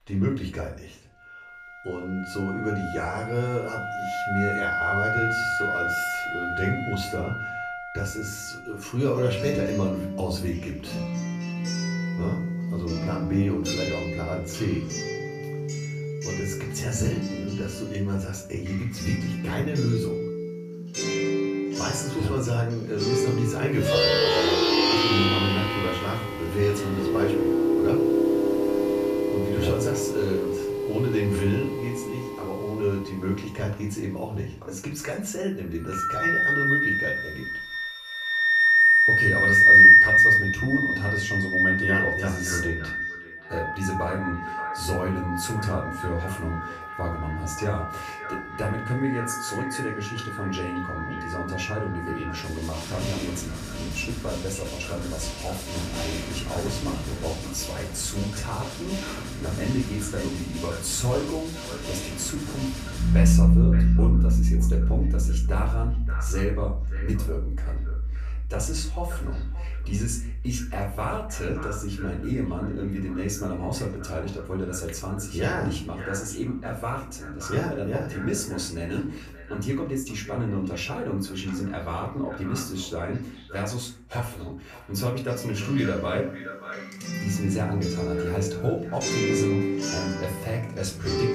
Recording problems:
off-mic speech; far
echo of what is said; noticeable; from 42 s on; 580 ms later, 15 dB below the speech
room echo; slight; dies away in 0.4 s
background music; very loud; throughout; 6 dB above the speech

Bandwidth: 14.5 kHz